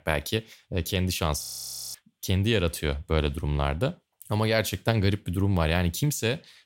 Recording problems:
audio freezing; at 1.5 s for 0.5 s

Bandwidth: 16 kHz